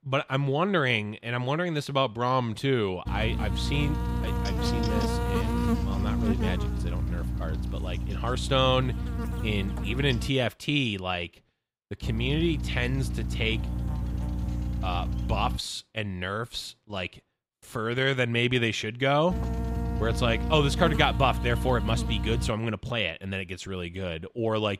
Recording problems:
electrical hum; loud; from 3 to 10 s, from 12 to 16 s and from 19 to 22 s; 60 Hz, 9 dB below the speech

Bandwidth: 15.5 kHz